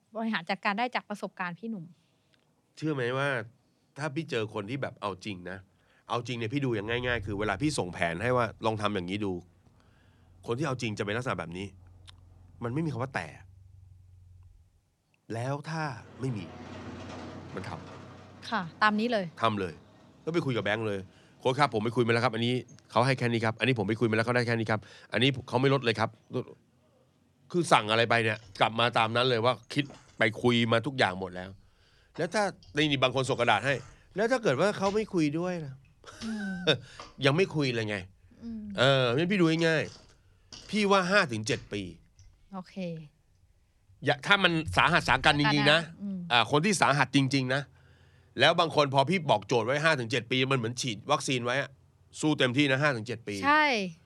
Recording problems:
traffic noise; faint; throughout; 25 dB below the speech

